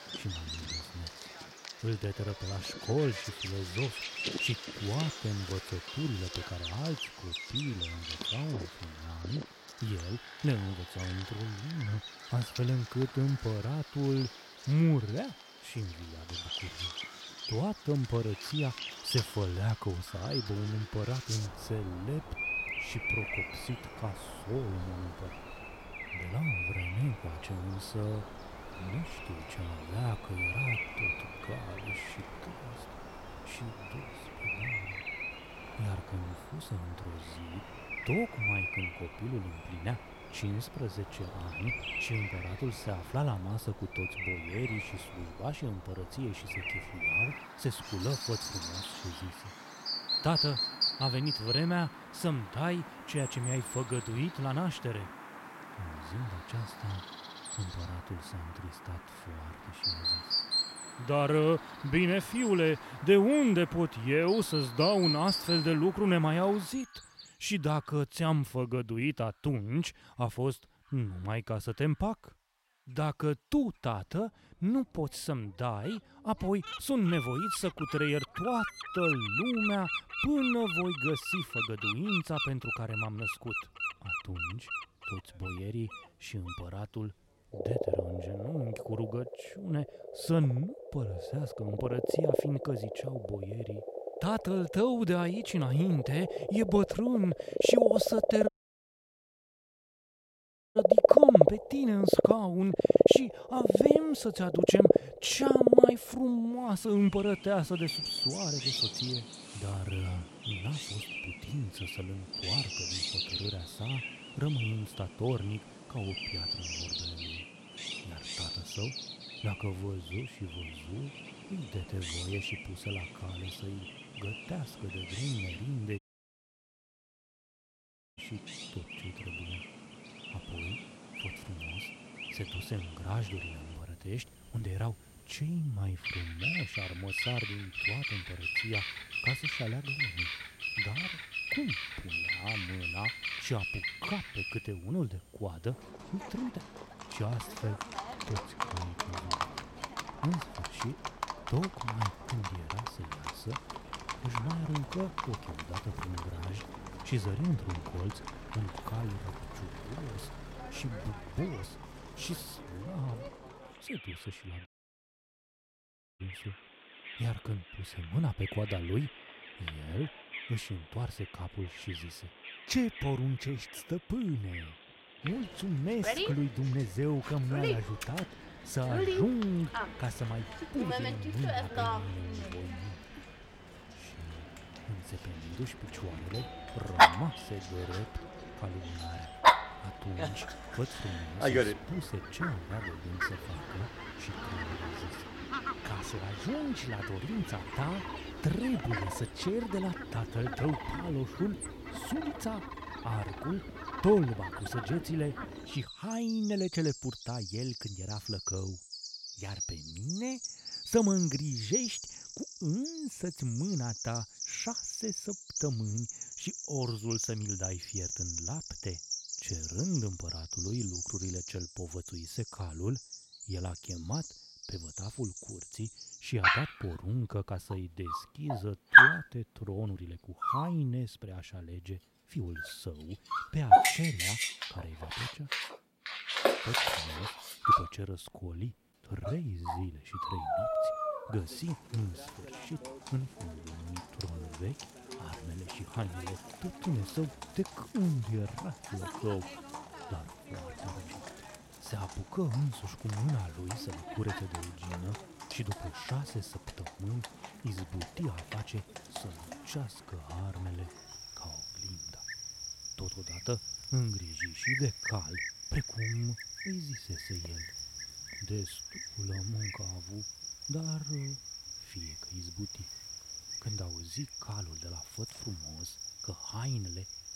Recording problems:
animal sounds; very loud; throughout; 2 dB above the speech
audio cutting out; at 1:38 for 2.5 s, at 2:06 for 2 s and at 2:45 for 1.5 s

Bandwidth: 16 kHz